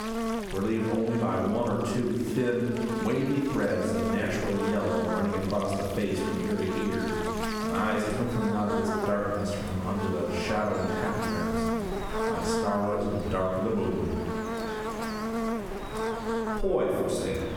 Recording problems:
off-mic speech; far
room echo; noticeable; dies away in 1 s
squashed, flat; somewhat
electrical hum; loud; throughout; 50 Hz, 3 dB below the speech
rain or running water; noticeable; throughout; 15 dB below the speech

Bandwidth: 18 kHz